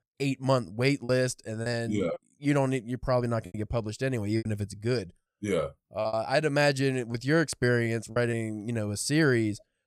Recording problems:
choppy; very; 6% of the speech affected

